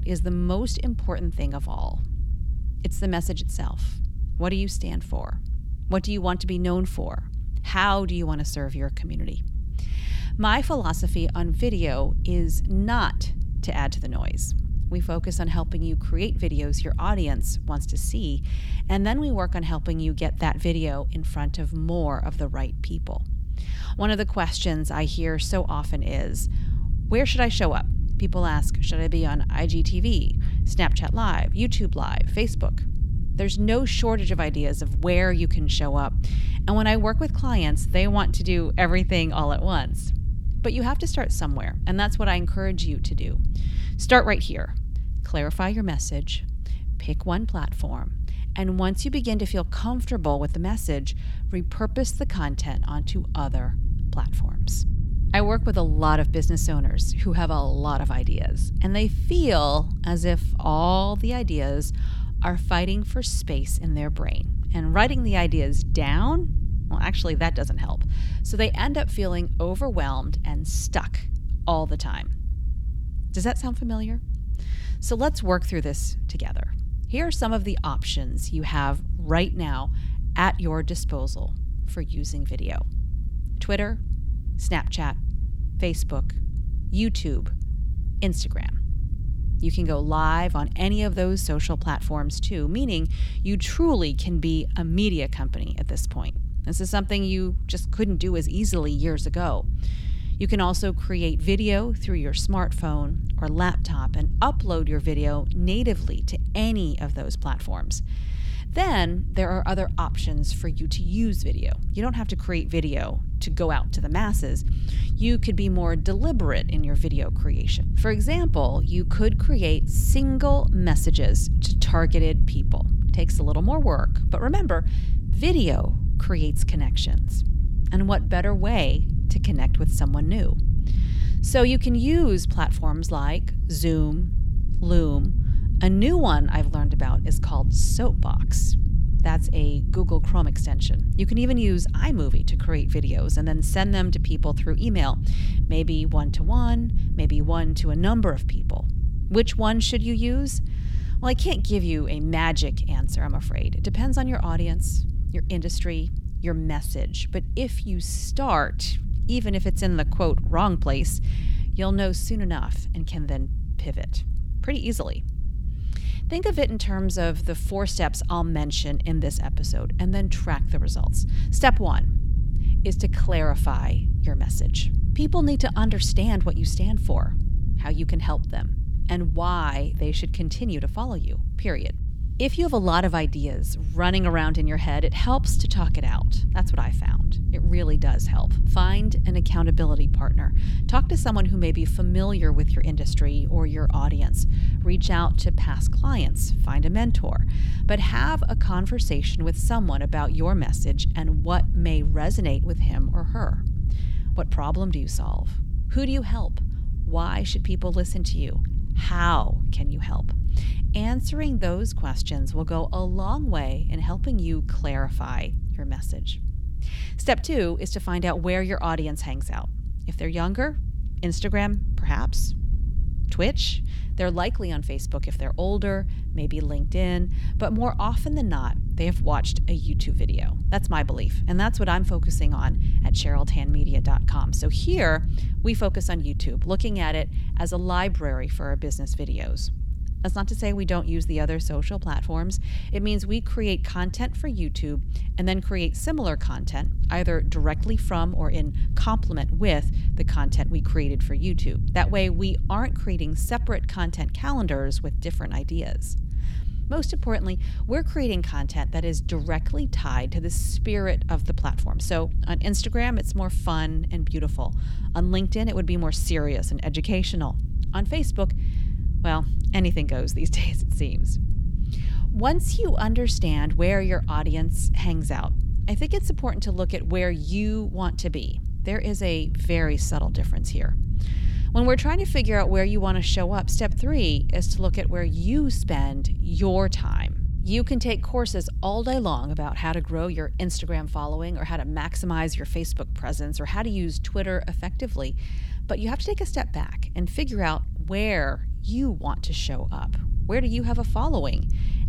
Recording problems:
low rumble; noticeable; throughout; 15 dB below the speech

